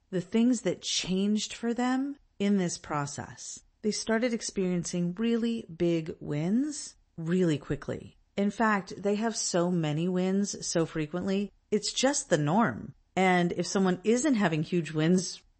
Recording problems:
garbled, watery; slightly; nothing above 8 kHz

